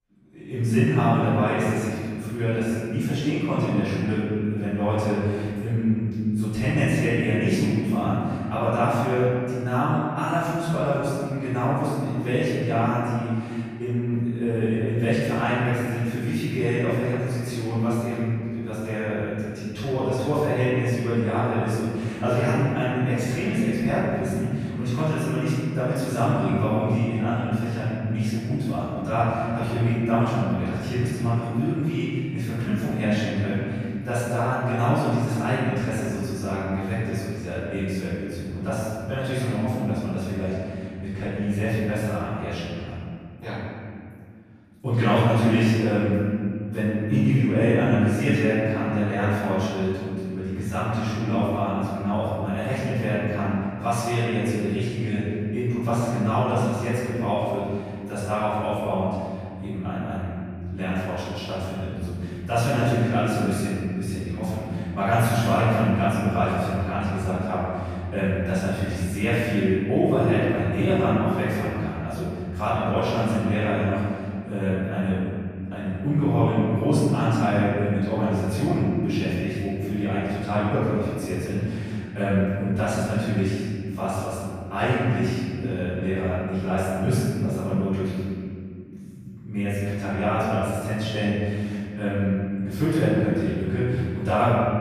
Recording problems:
room echo; strong; dies away in 2.4 s
off-mic speech; far

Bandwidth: 15 kHz